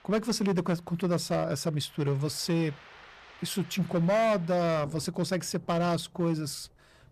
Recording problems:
distortion; slight; 9% of the sound clipped
rain or running water; faint; throughout; 25 dB below the speech

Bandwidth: 14.5 kHz